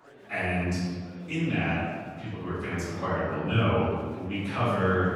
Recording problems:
room echo; strong; dies away in 1.4 s
off-mic speech; far
murmuring crowd; faint; throughout; 20 dB below the speech

